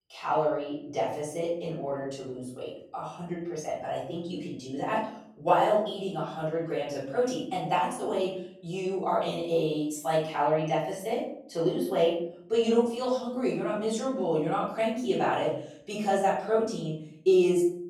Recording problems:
off-mic speech; far
room echo; noticeable; dies away in 0.6 s

